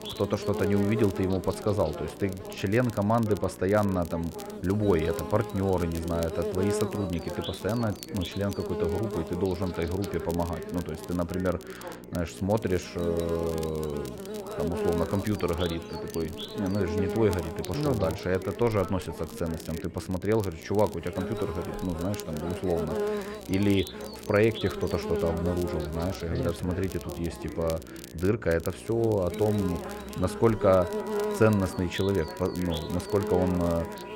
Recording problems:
muffled; slightly; fading above 3.5 kHz
electrical hum; loud; throughout; 60 Hz, 7 dB below the speech
voice in the background; noticeable; throughout; 15 dB below the speech
crackle, like an old record; noticeable; 20 dB below the speech
background music; faint; throughout; 25 dB below the speech

